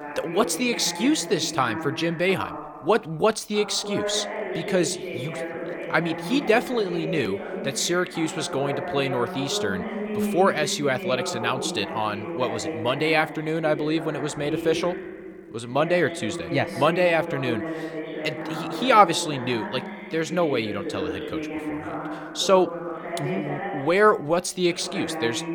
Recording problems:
voice in the background; loud; throughout; 7 dB below the speech

